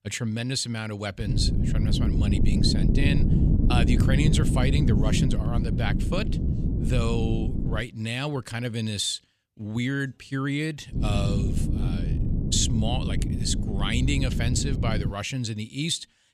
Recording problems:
wind noise on the microphone; heavy; from 1.5 to 8 s and from 11 to 15 s; 5 dB below the speech

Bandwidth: 15 kHz